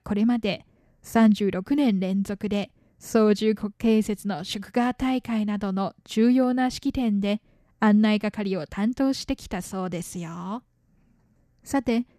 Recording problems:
none

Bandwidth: 14.5 kHz